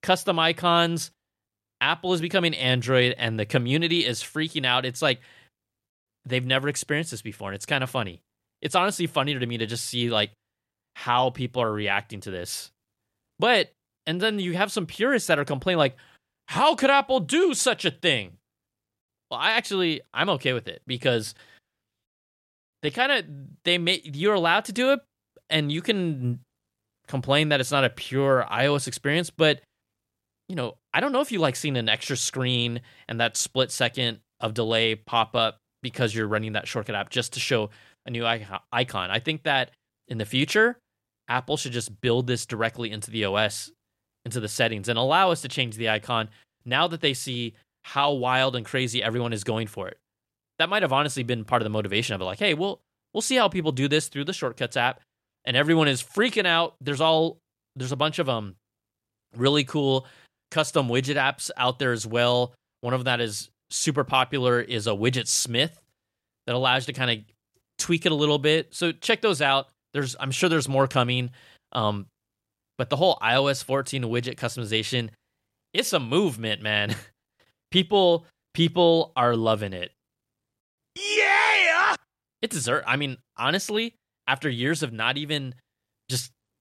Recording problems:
none

